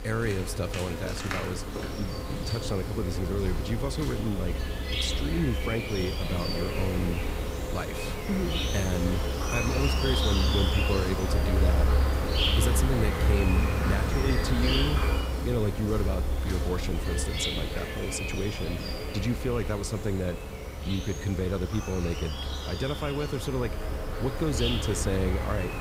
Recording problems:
animal sounds; very loud; throughout; 2 dB above the speech

